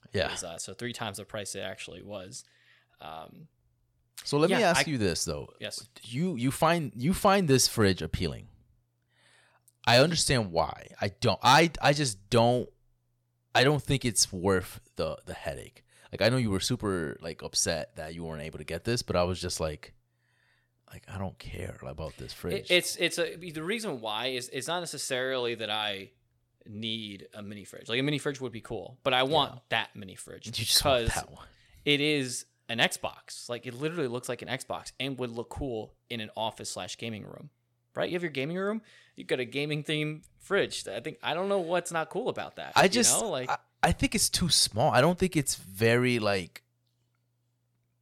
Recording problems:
none

